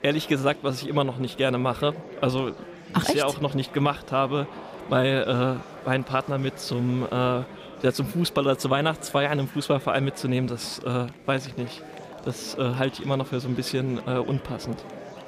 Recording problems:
murmuring crowd; noticeable; throughout; 15 dB below the speech

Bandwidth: 15 kHz